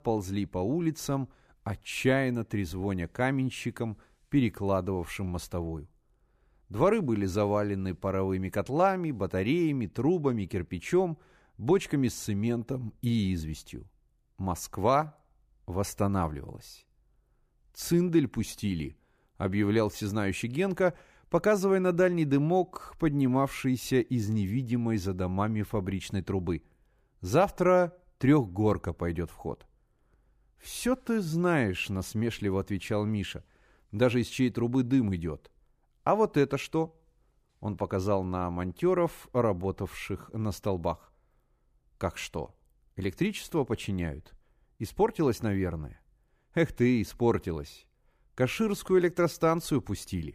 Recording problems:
none

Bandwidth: 15 kHz